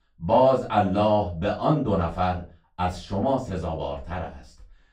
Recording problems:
off-mic speech; far
room echo; slight; dies away in 0.3 s

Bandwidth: 15.5 kHz